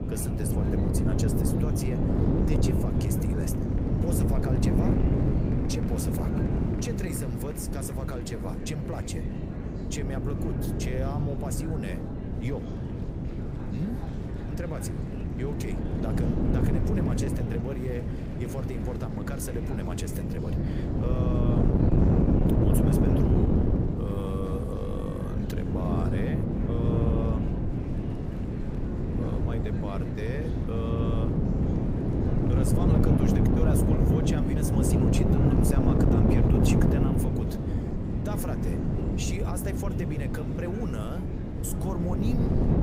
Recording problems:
wind noise on the microphone; heavy; 4 dB above the speech
chatter from many people; noticeable; throughout; 15 dB below the speech

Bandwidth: 15.5 kHz